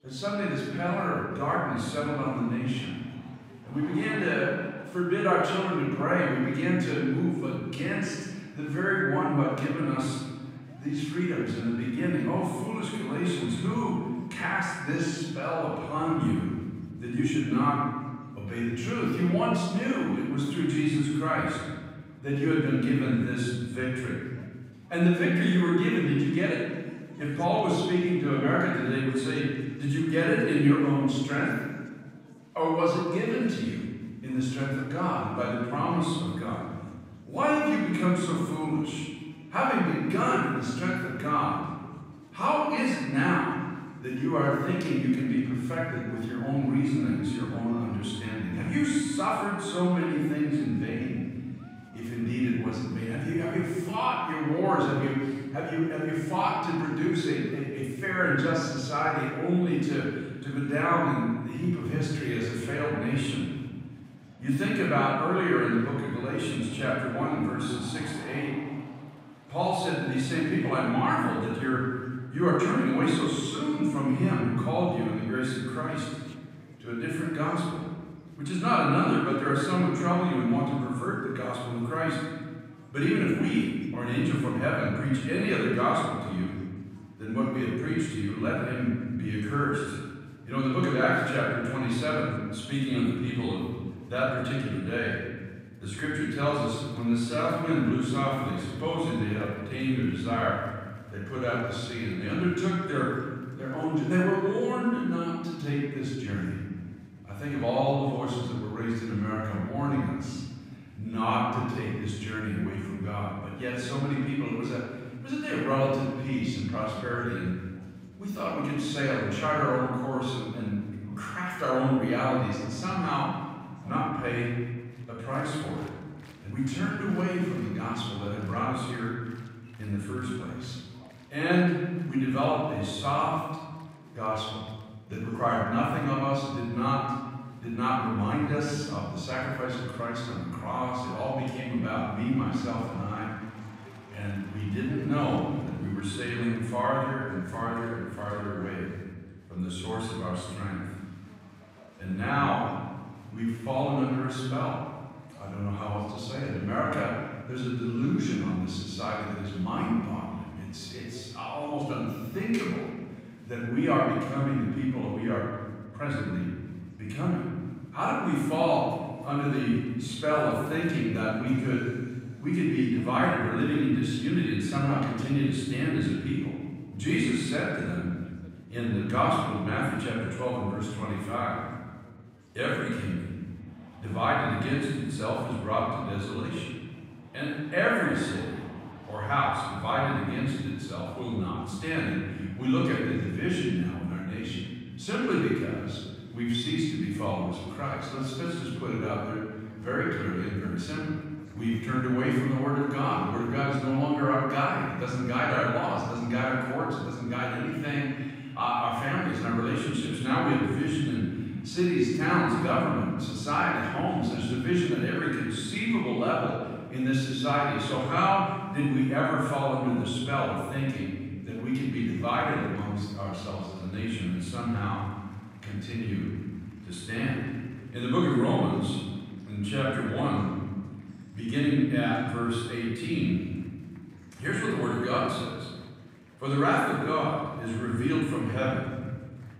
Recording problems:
room echo; strong; dies away in 1.5 s
off-mic speech; far
chatter from many people; faint; throughout; 25 dB below the speech

